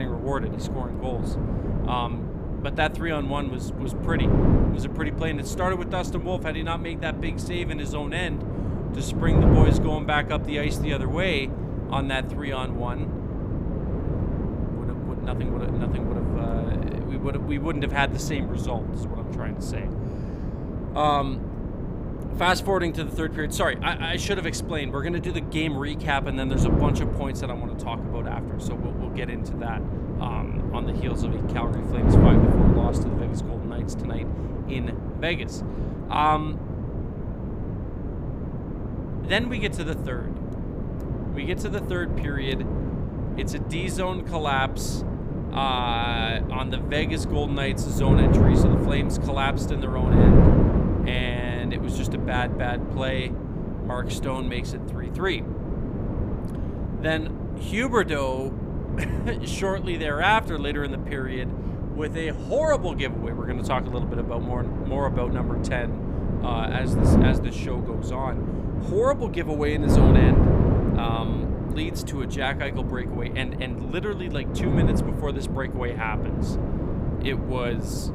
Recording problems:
wind noise on the microphone; heavy; 5 dB below the speech
abrupt cut into speech; at the start

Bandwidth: 15.5 kHz